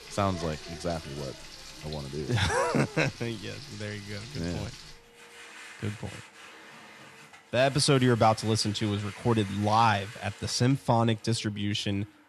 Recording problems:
household noises; noticeable; throughout; 15 dB below the speech

